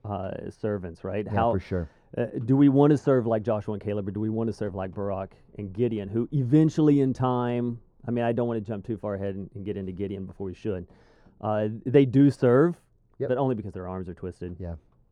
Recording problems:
muffled; very; fading above 1.5 kHz

